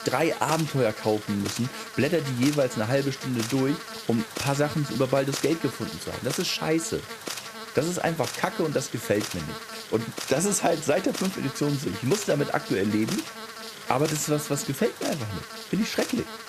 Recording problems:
electrical hum; loud; throughout; 50 Hz, 7 dB below the speech

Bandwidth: 14.5 kHz